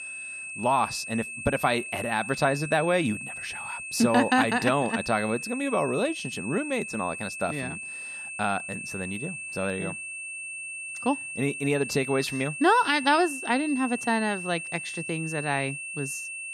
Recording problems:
high-pitched whine; loud; throughout; 2.5 kHz, 7 dB below the speech

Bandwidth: 13.5 kHz